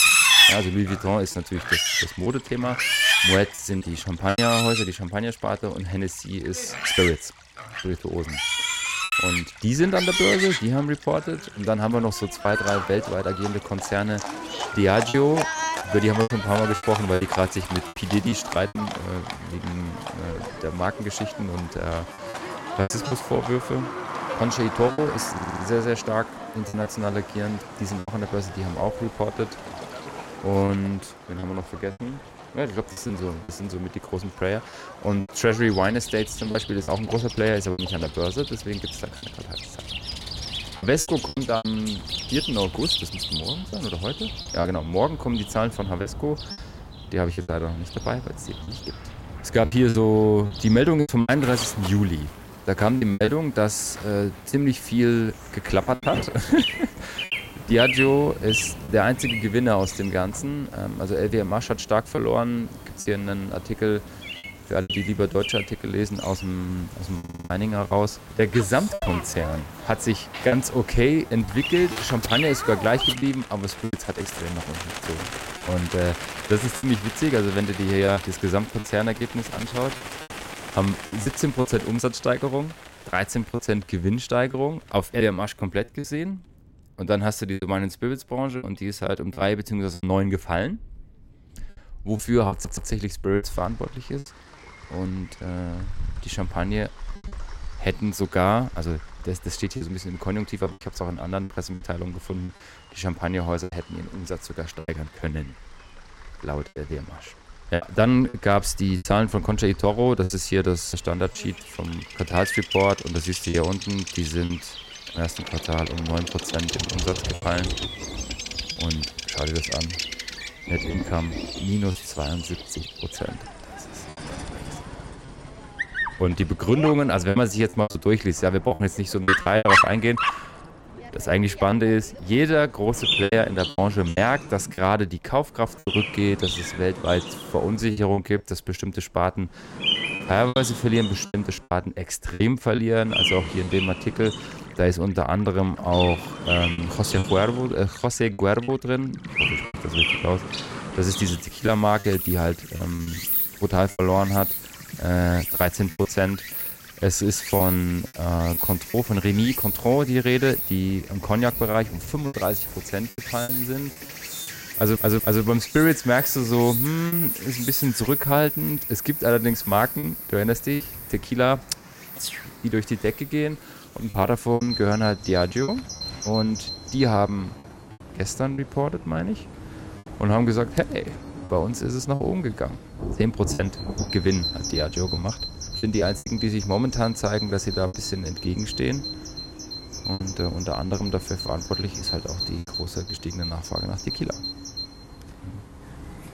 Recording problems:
animal sounds; loud; throughout; 3 dB below the speech
rain or running water; faint; throughout; 20 dB below the speech
choppy; very; 5% of the speech affected
audio stuttering; 4 times, first at 25 s

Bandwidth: 16 kHz